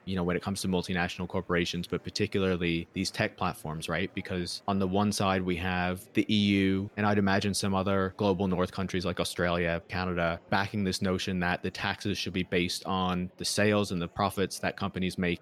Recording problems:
murmuring crowd; faint; throughout; 30 dB below the speech

